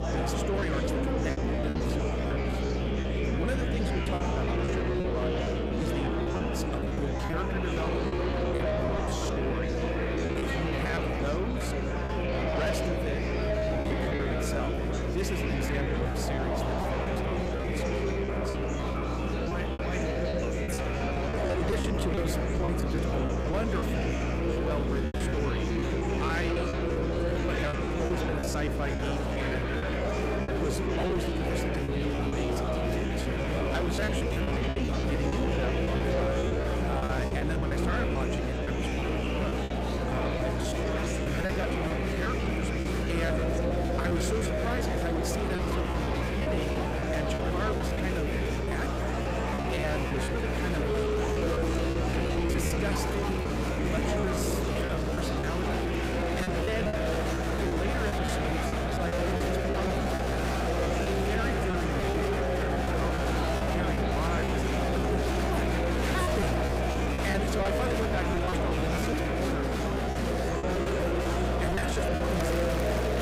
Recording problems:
distortion; slight; 10 dB below the speech
murmuring crowd; very loud; throughout; 4 dB above the speech
electrical hum; loud; throughout; 60 Hz, 6 dB below the speech
choppy; very; 15% of the speech affected

